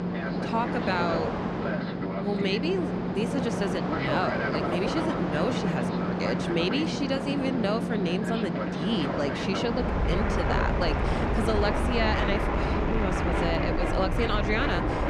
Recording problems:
train or aircraft noise; very loud; throughout; 2 dB above the speech
electrical hum; faint; throughout; 50 Hz, 30 dB below the speech

